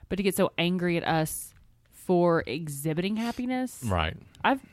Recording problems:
none

